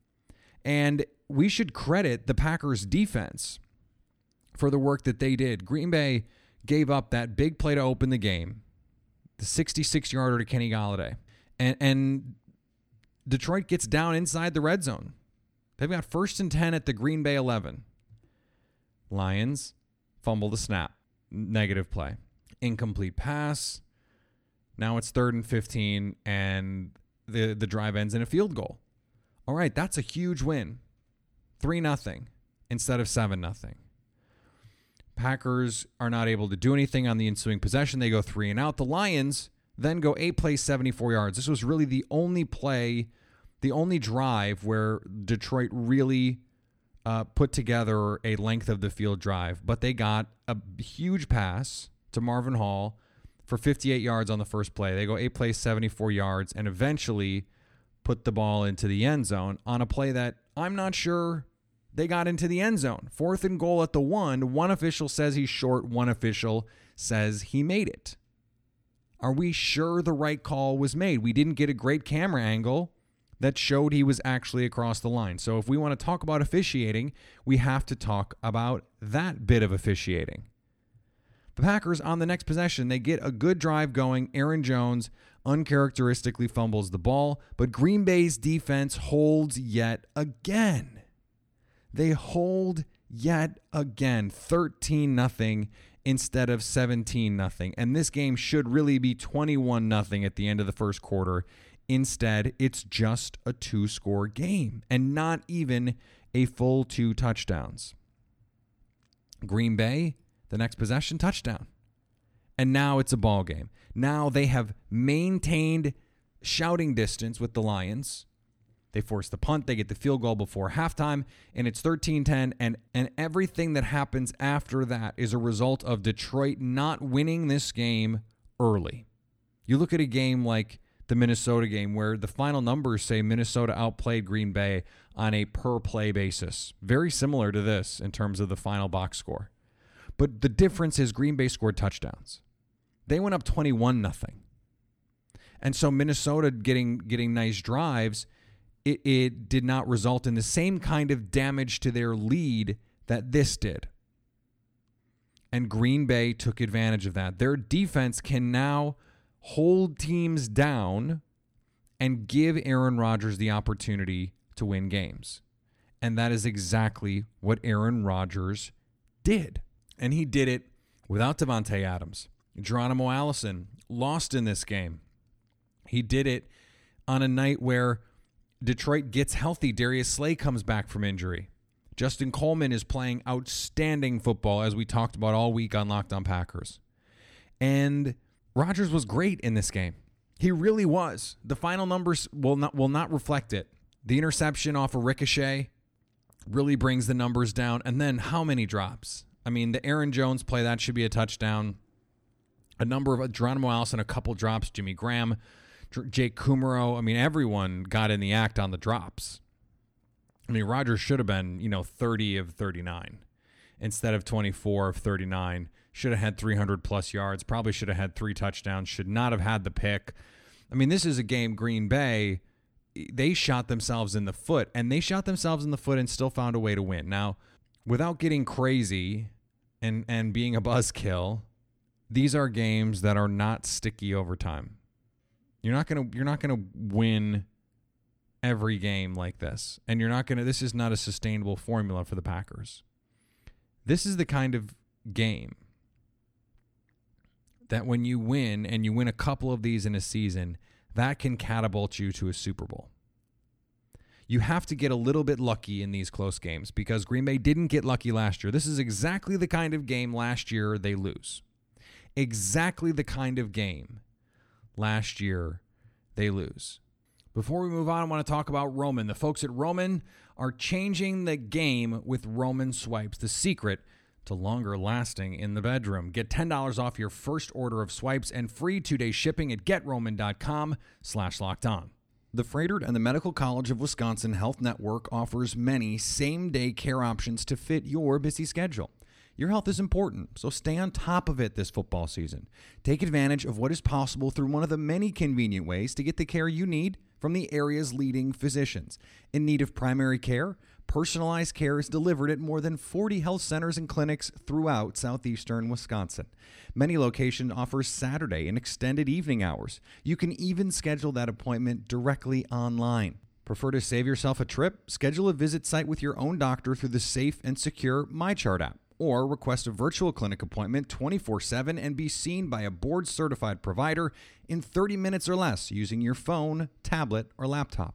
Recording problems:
none

